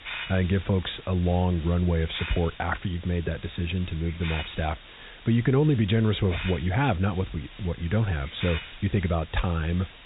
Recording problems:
high frequencies cut off; severe; nothing above 4 kHz
hiss; noticeable; throughout; 15 dB below the speech

